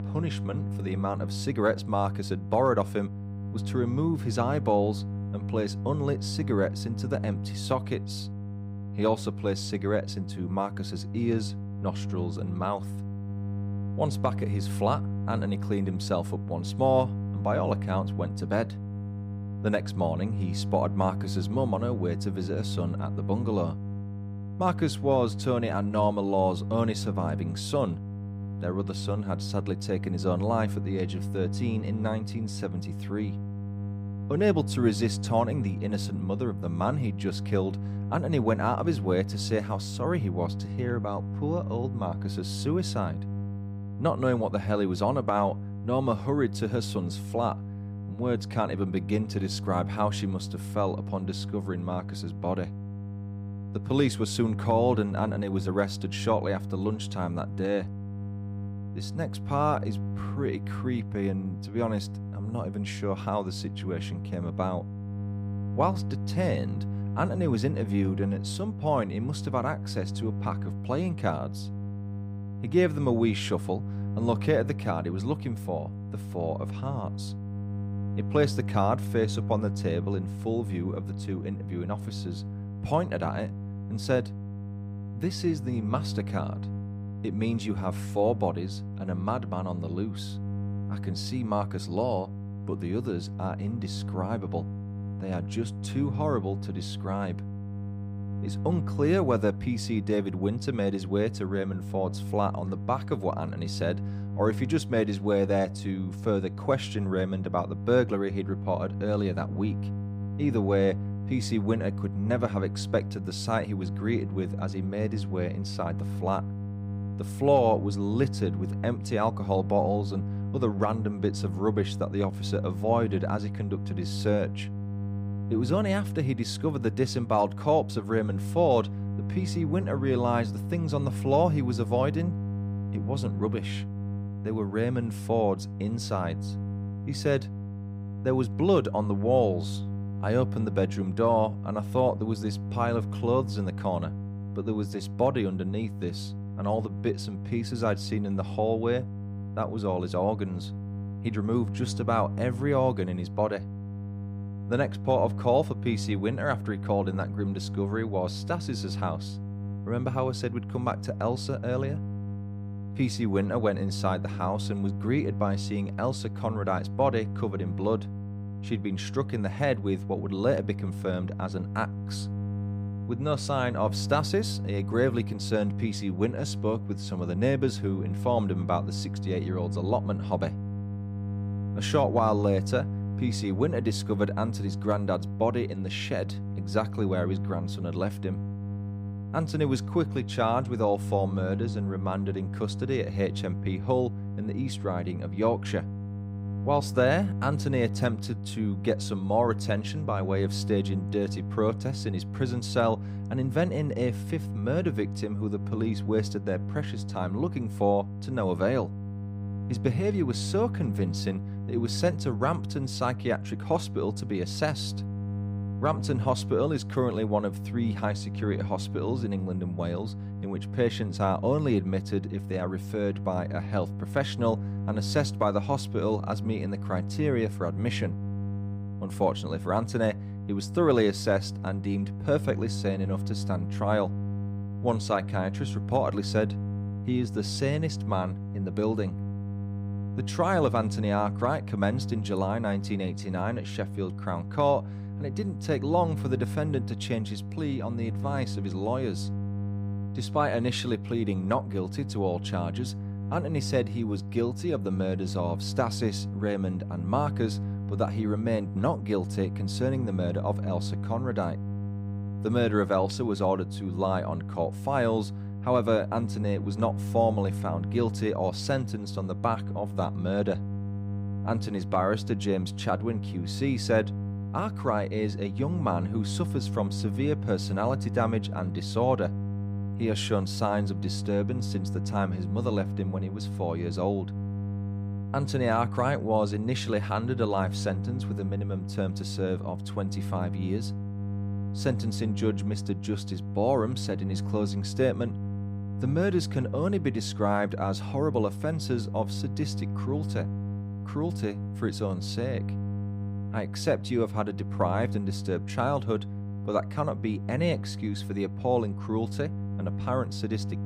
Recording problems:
electrical hum; noticeable; throughout; 50 Hz, 15 dB below the speech

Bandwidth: 15.5 kHz